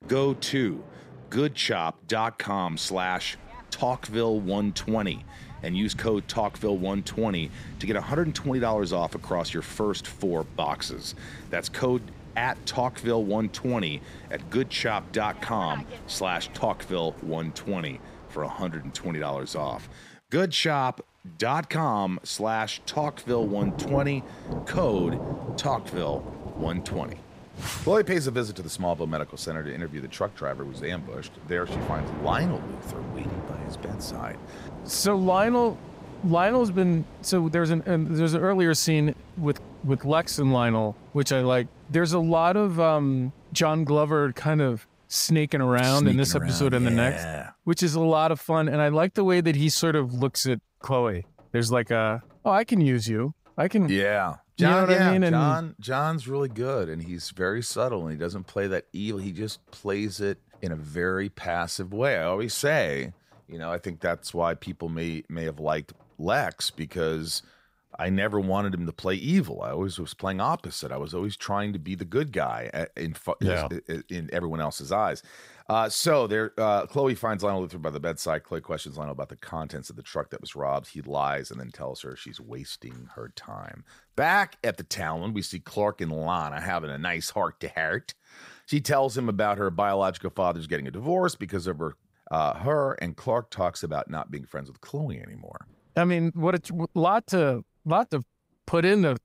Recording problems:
rain or running water; noticeable; throughout; 15 dB below the speech

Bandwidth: 15.5 kHz